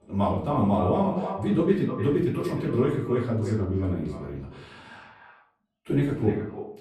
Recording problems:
echo of what is said; strong; throughout; 300 ms later, 10 dB below the speech
off-mic speech; far
room echo; slight; dies away in 0.5 s

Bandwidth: 13.5 kHz